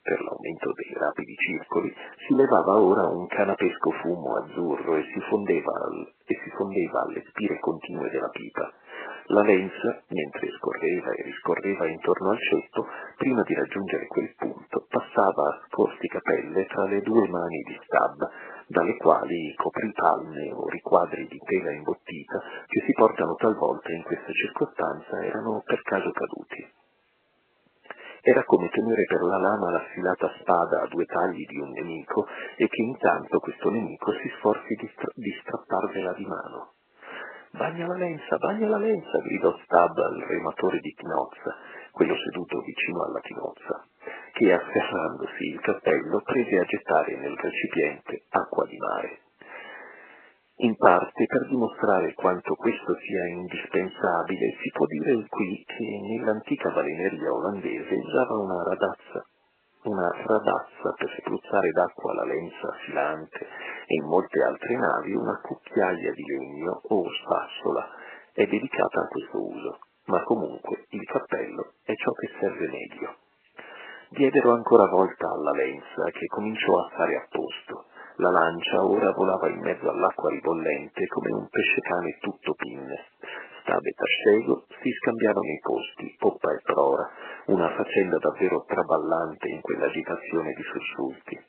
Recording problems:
garbled, watery; badly
phone-call audio

